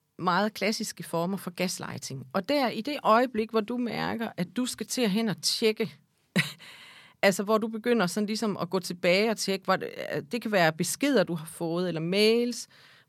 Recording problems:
none

